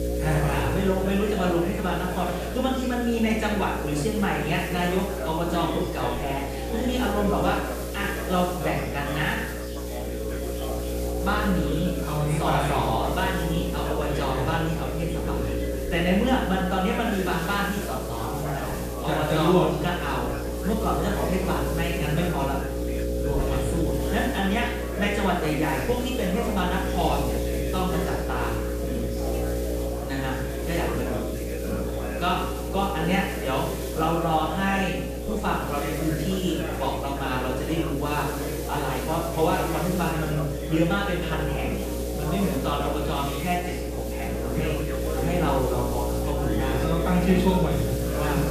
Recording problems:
off-mic speech; far
room echo; noticeable; dies away in 0.7 s
electrical hum; loud; throughout; 60 Hz, 7 dB below the speech
chatter from many people; loud; throughout; 8 dB below the speech
hiss; noticeable; throughout; 15 dB below the speech

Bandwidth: 14.5 kHz